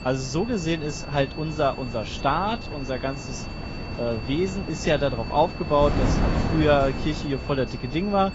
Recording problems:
garbled, watery; badly; nothing above 7.5 kHz
high-pitched whine; noticeable; throughout; 2.5 kHz, 15 dB below the speech
wind noise on the microphone; occasional gusts; 10 dB below the speech
animal sounds; faint; throughout; 25 dB below the speech

